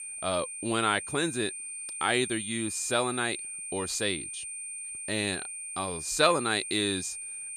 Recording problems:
high-pitched whine; loud; throughout; 9 kHz, 6 dB below the speech

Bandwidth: 14.5 kHz